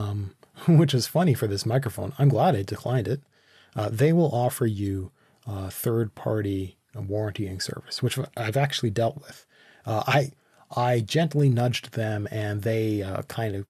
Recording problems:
abrupt cut into speech; at the start

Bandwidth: 13.5 kHz